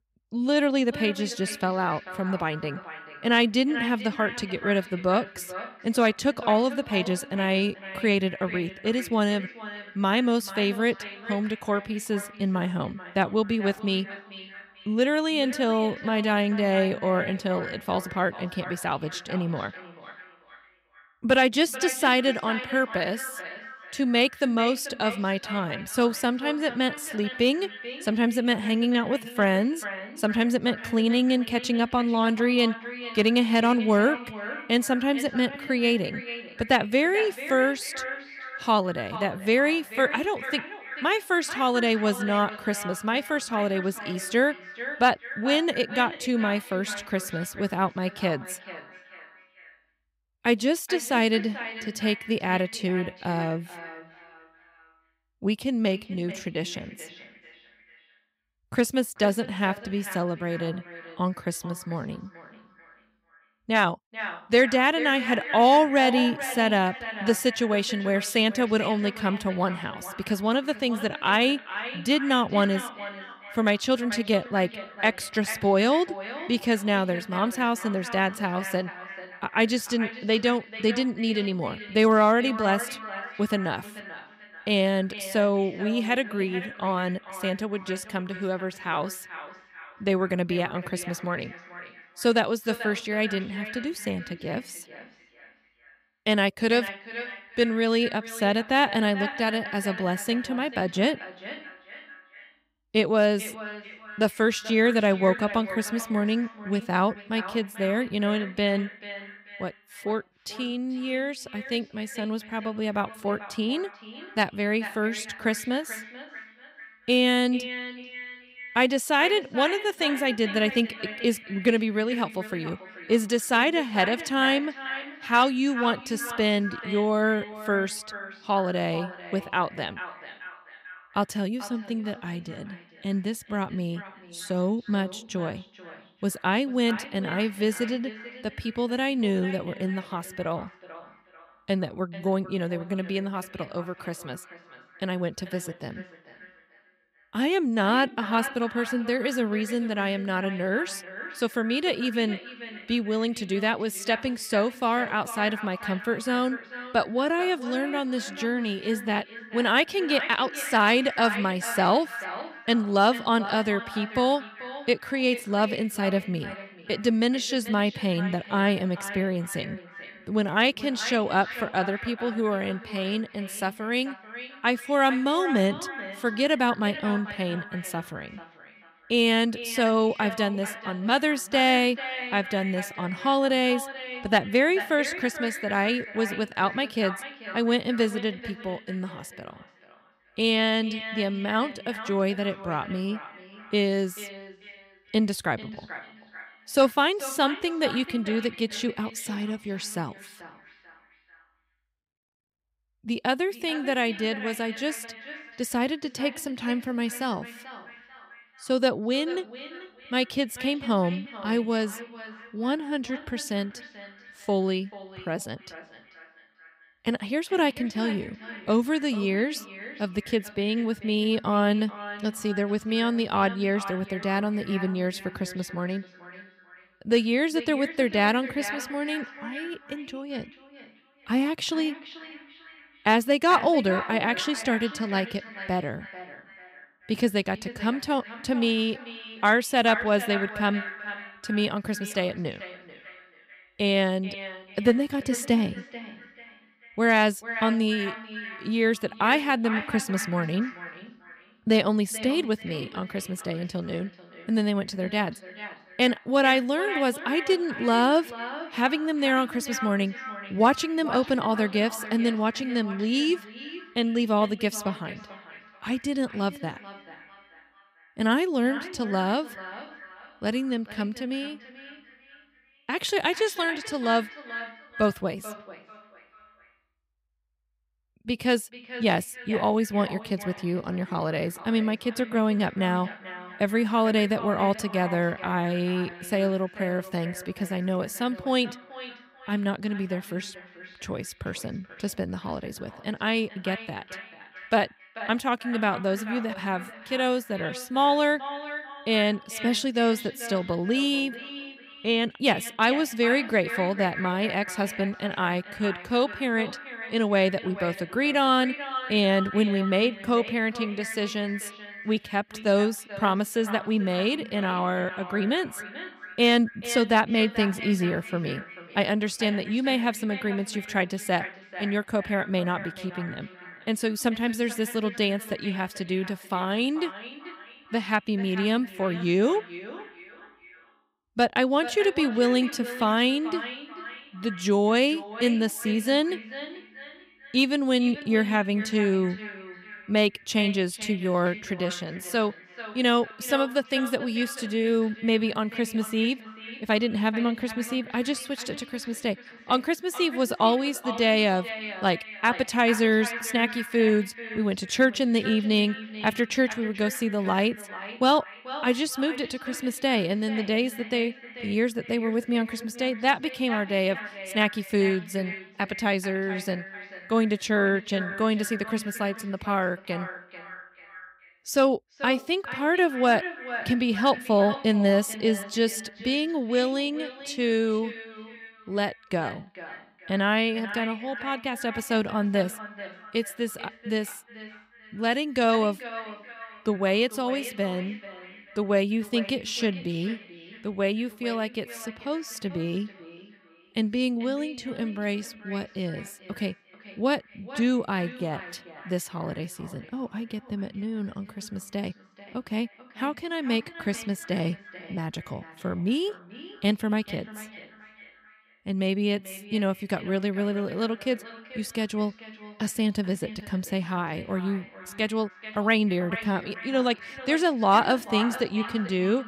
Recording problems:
echo of what is said; noticeable; throughout; 440 ms later, 10 dB below the speech

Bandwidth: 15.5 kHz